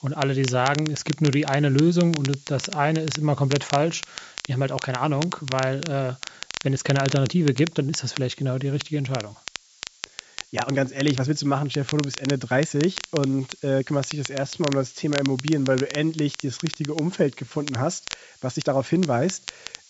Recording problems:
high frequencies cut off; noticeable; nothing above 8 kHz
crackle, like an old record; noticeable; 10 dB below the speech
hiss; faint; throughout; 25 dB below the speech
uneven, jittery; strongly; from 2.5 to 19 s

